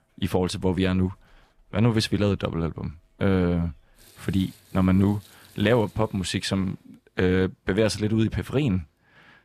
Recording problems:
household noises; faint; until 6.5 s; 30 dB below the speech

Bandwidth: 14.5 kHz